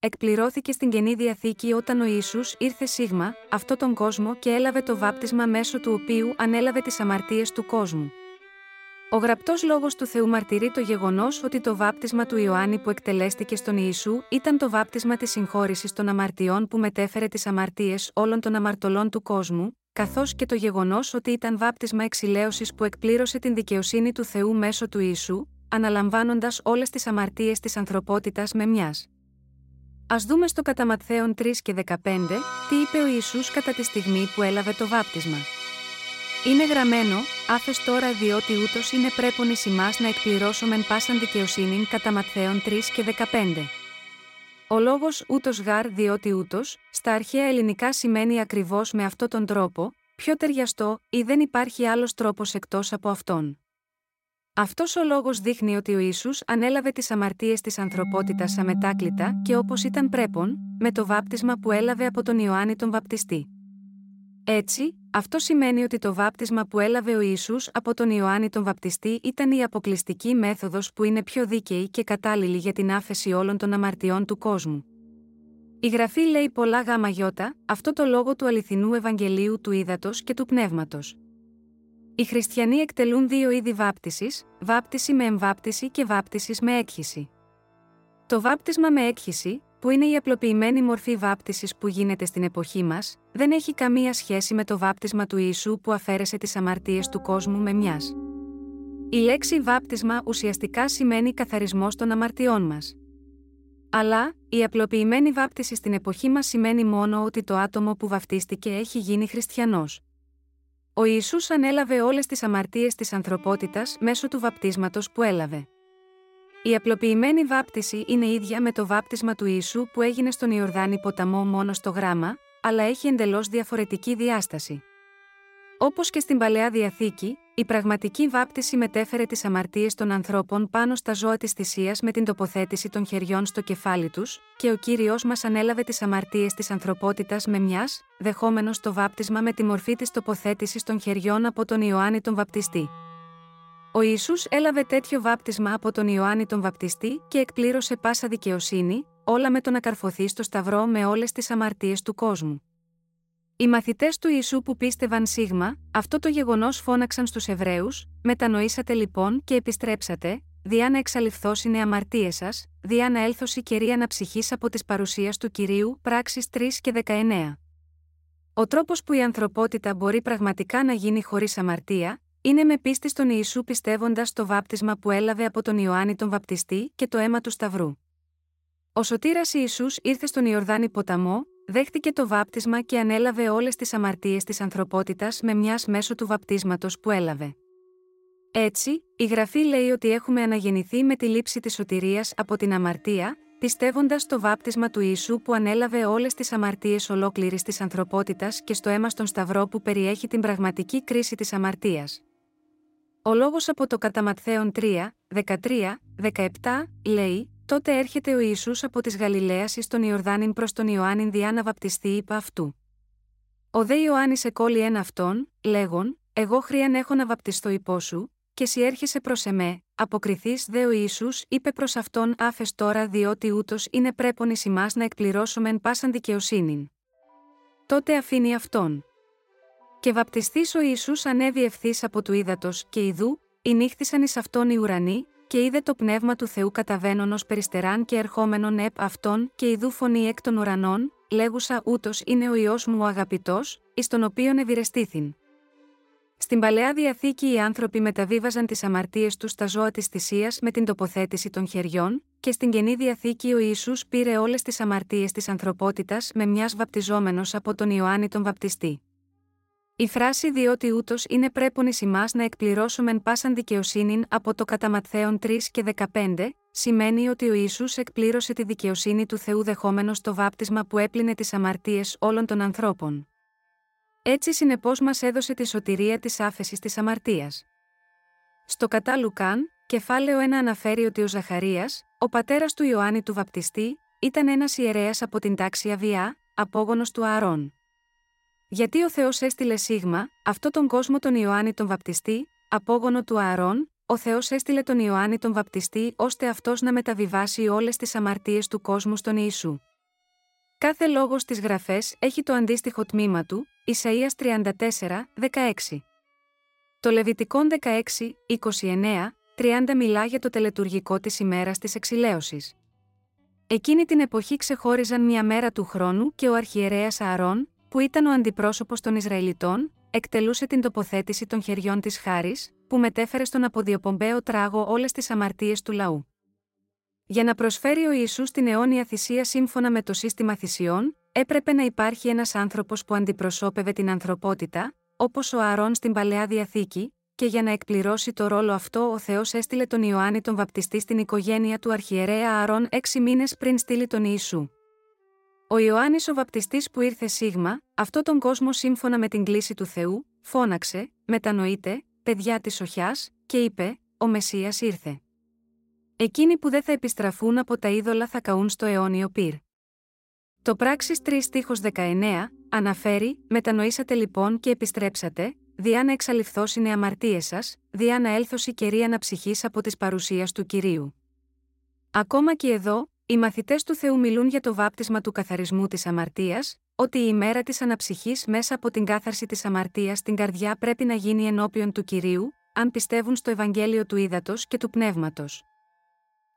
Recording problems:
background music; noticeable; throughout; 10 dB below the speech

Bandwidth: 16 kHz